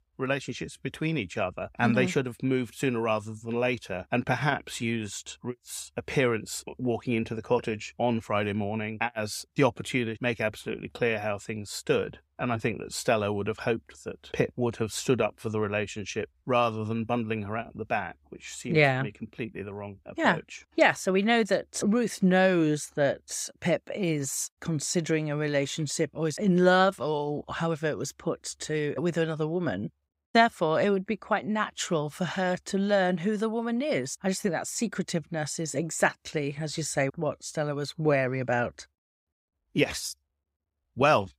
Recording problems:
none

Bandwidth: 15.5 kHz